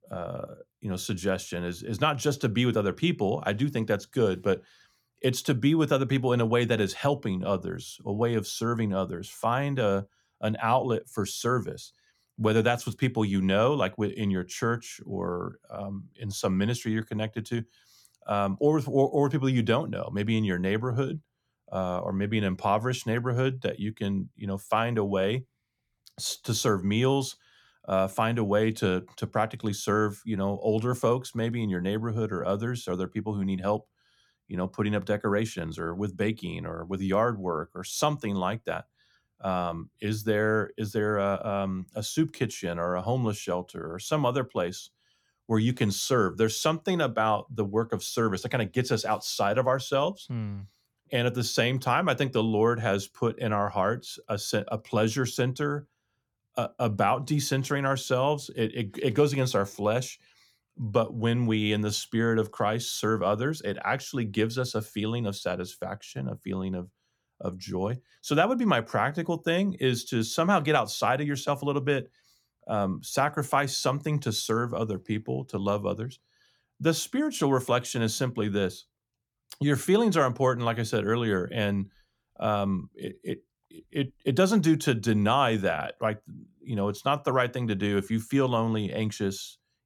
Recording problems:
none

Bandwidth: 18 kHz